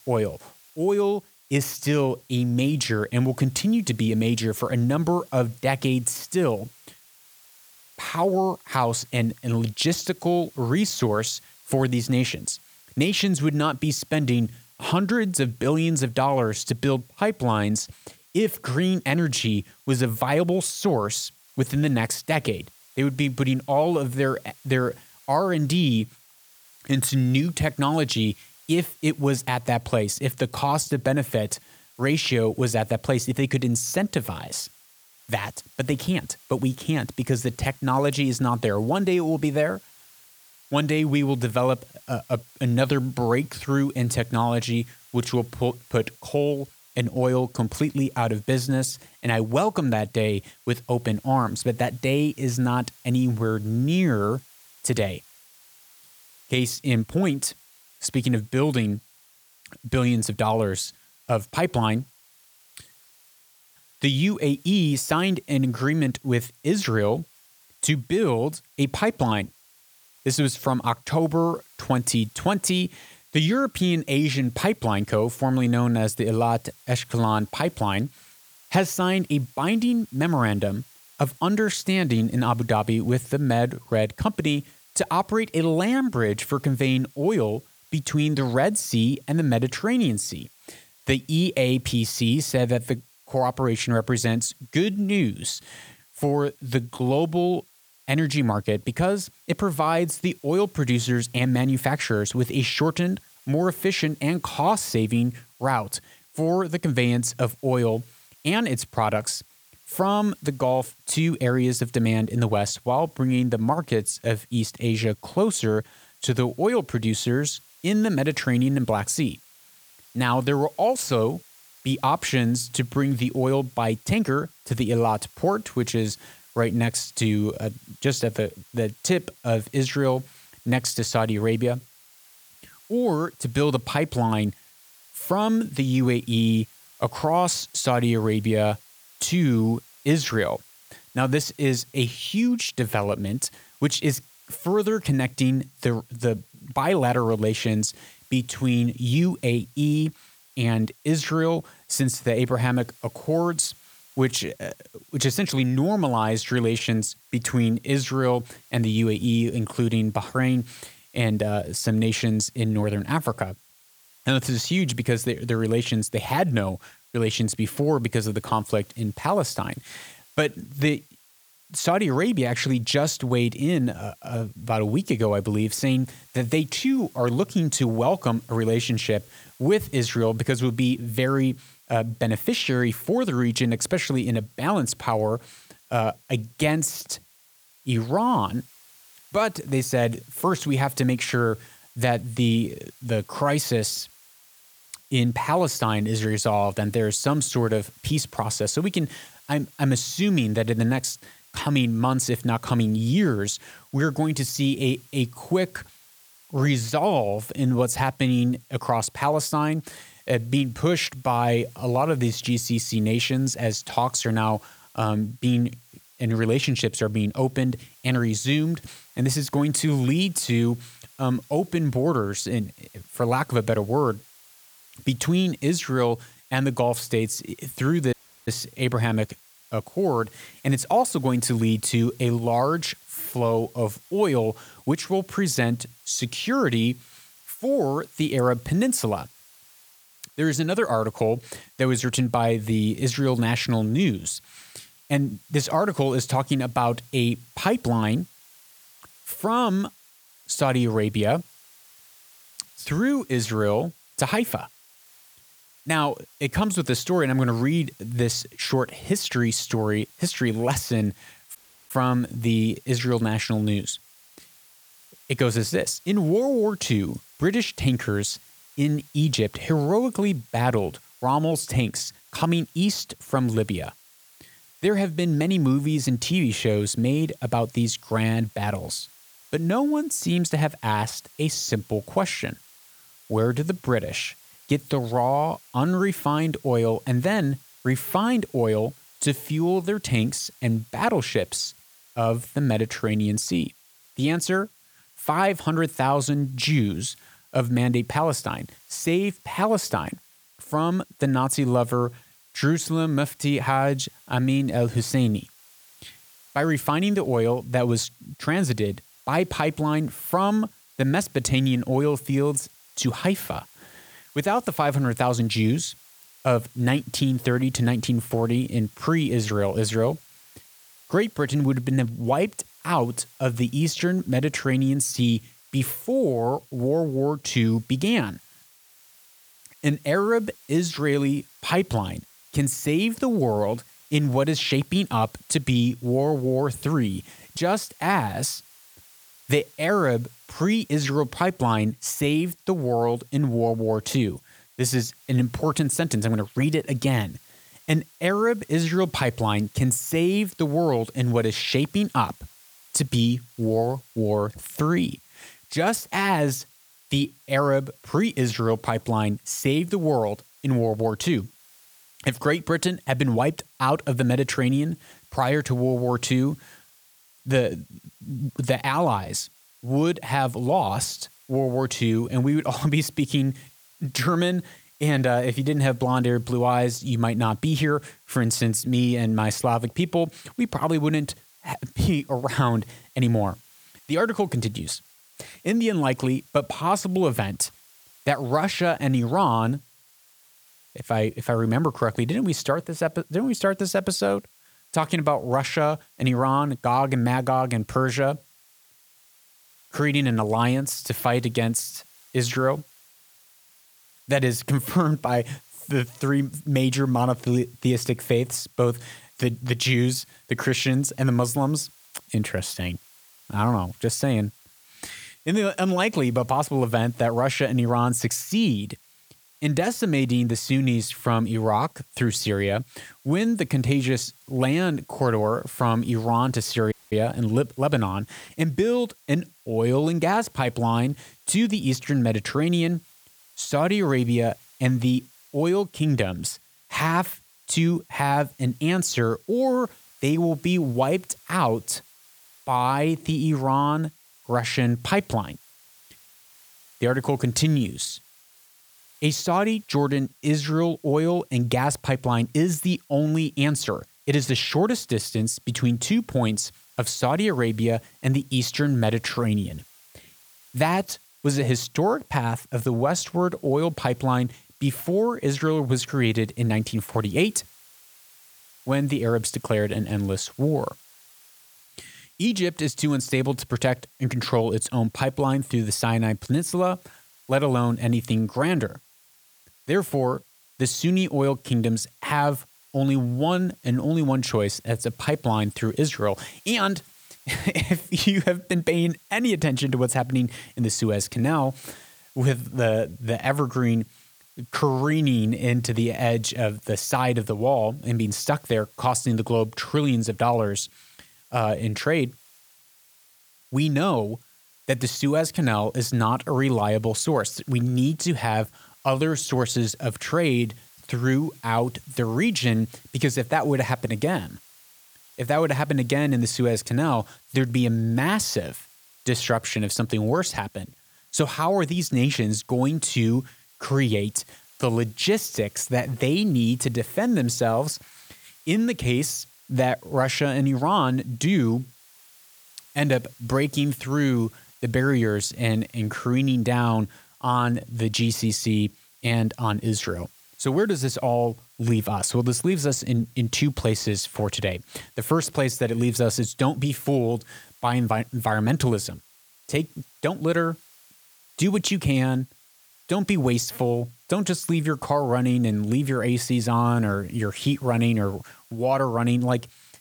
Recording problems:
hiss; faint; throughout; 25 dB below the speech
audio cutting out; at 3:48, at 4:22 and at 7:07

